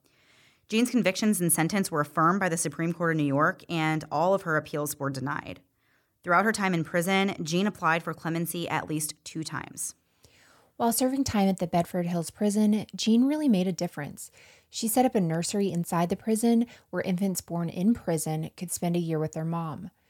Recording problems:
none

